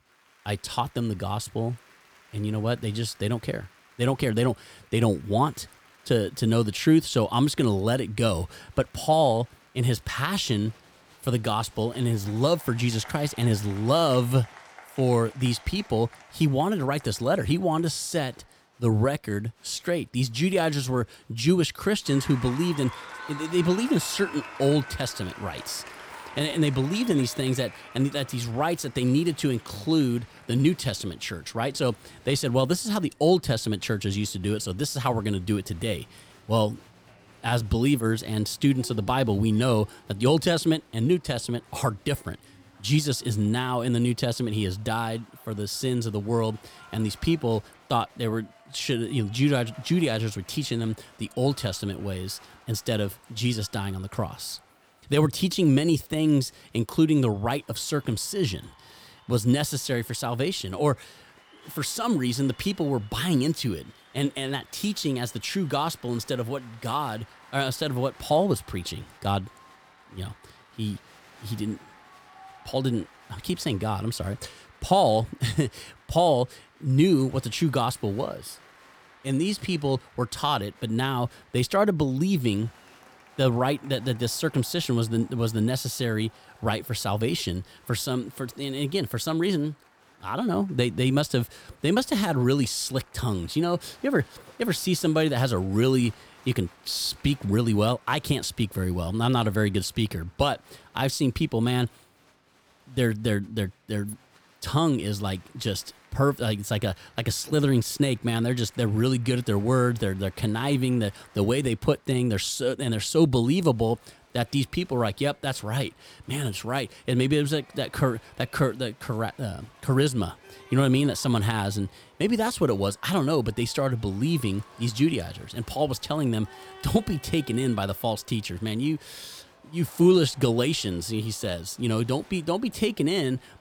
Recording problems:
crowd noise; faint; throughout; 25 dB below the speech

